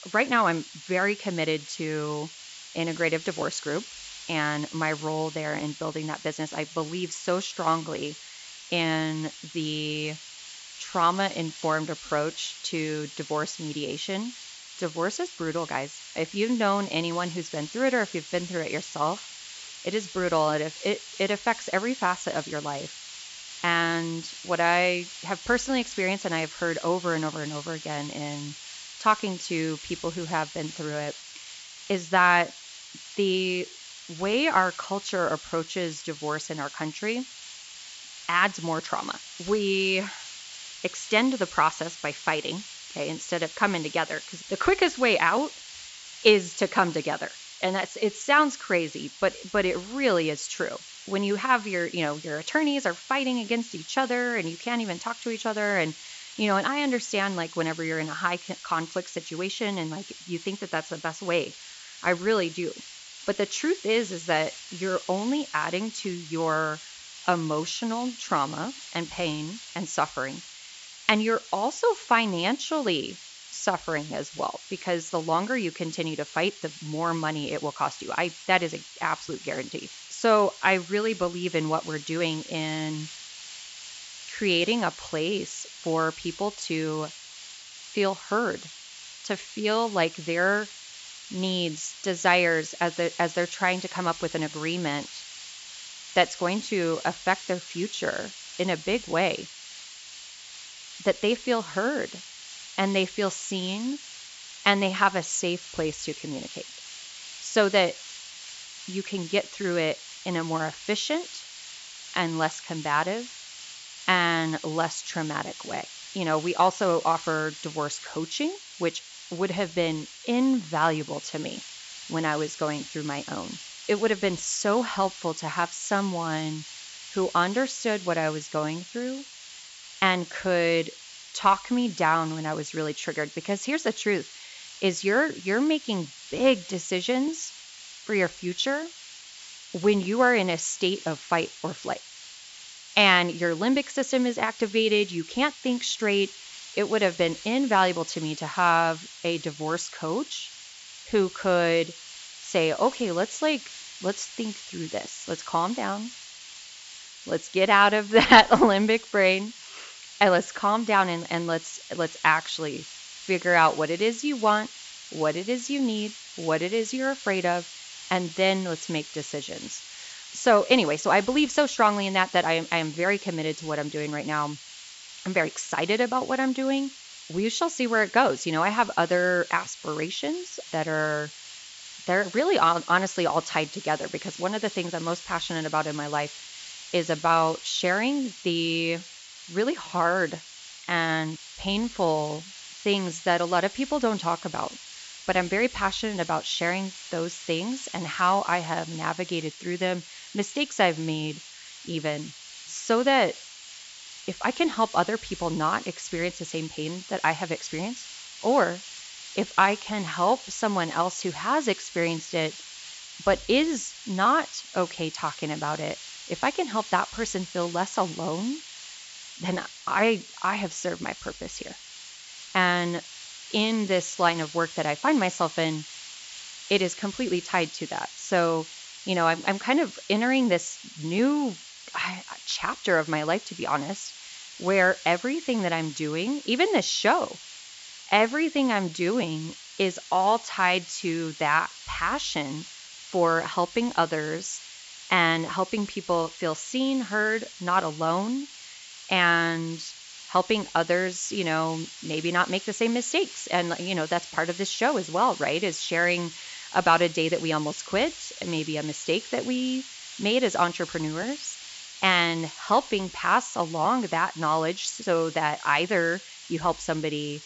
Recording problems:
high frequencies cut off; noticeable; nothing above 8 kHz
hiss; noticeable; throughout; 15 dB below the speech

